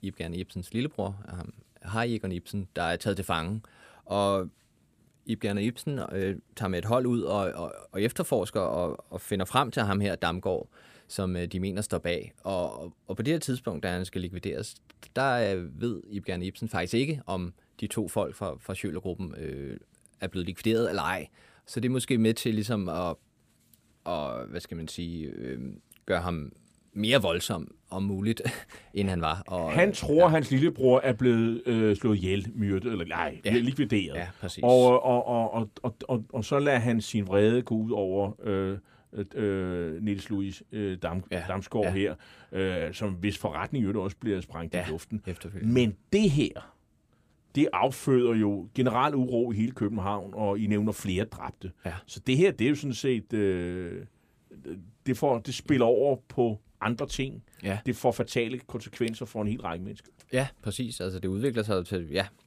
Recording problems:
none

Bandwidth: 15 kHz